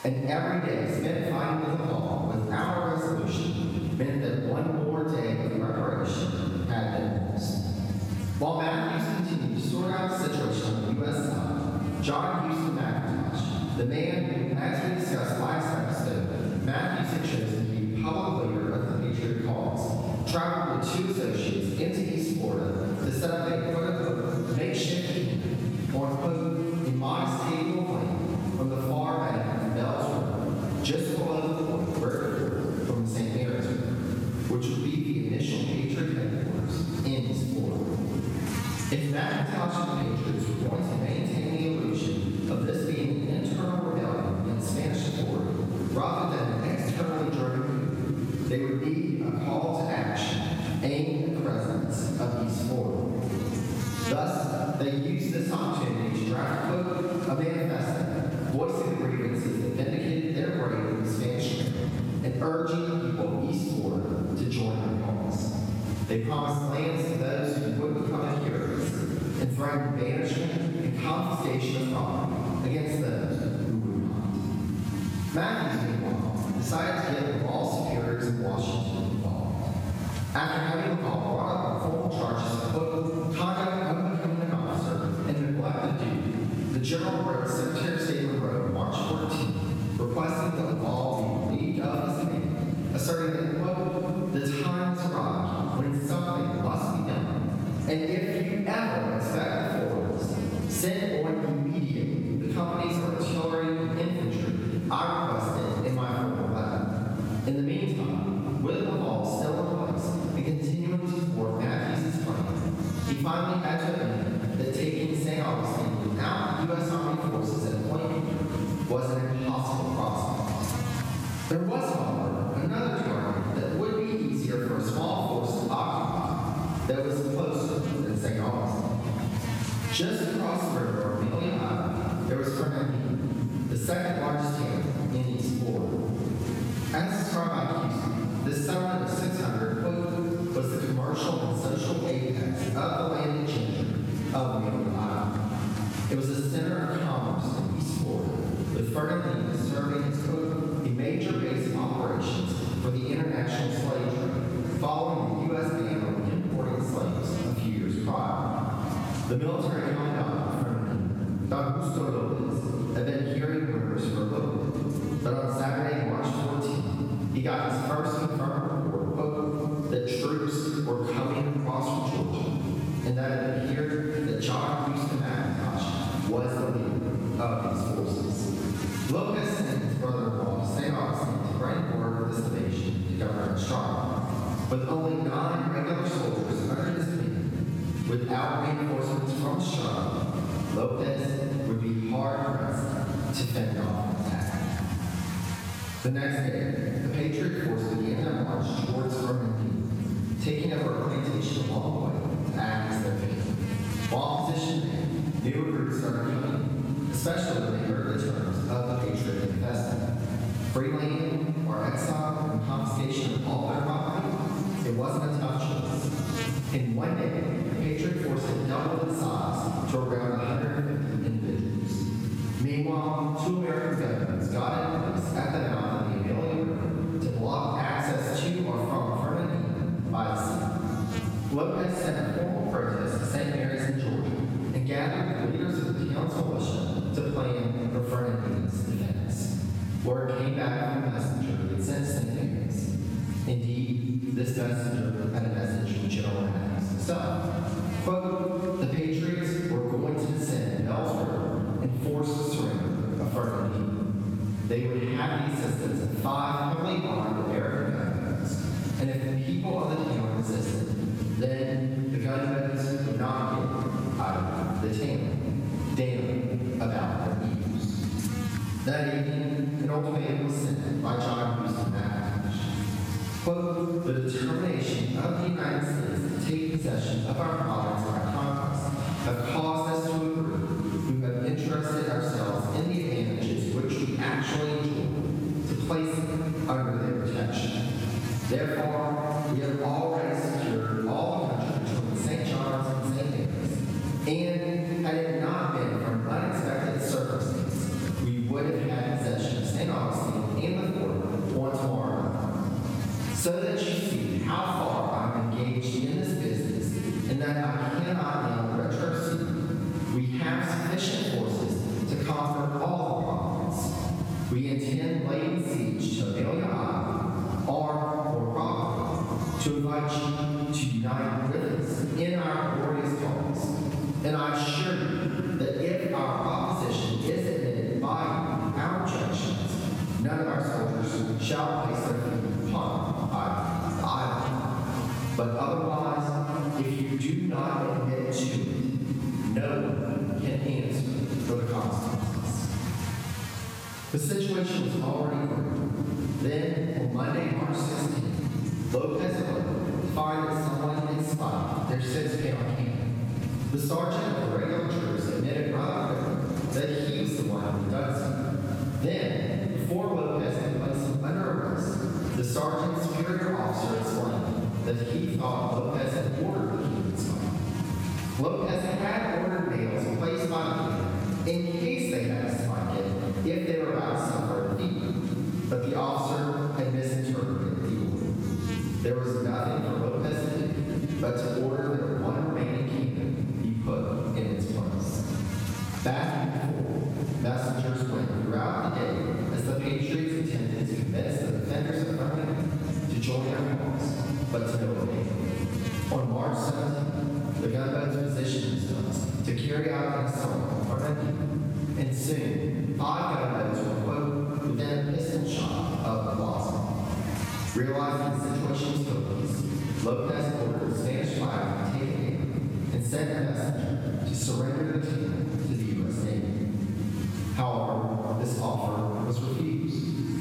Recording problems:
room echo; strong; dies away in 2.6 s
off-mic speech; far
squashed, flat; somewhat
electrical hum; noticeable; throughout; 60 Hz, 15 dB below the speech

